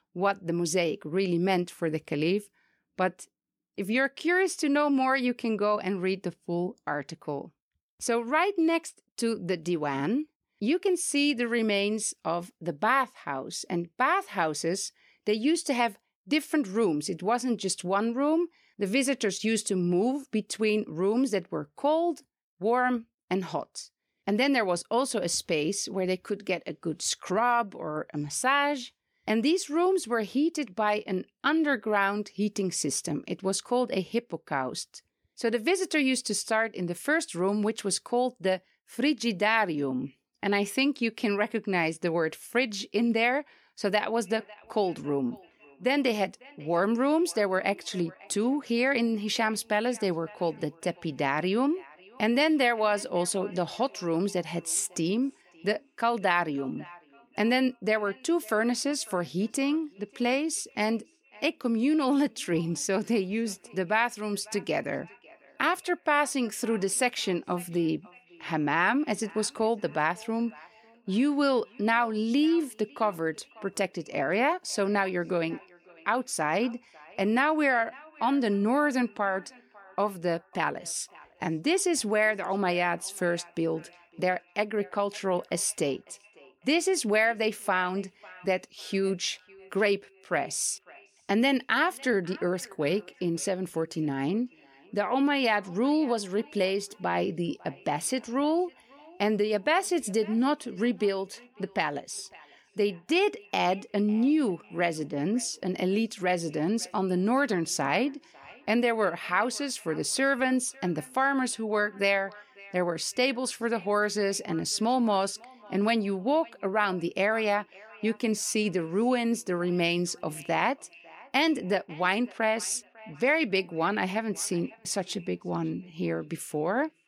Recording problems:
echo of what is said; faint; from 44 s on; 550 ms later, 25 dB below the speech

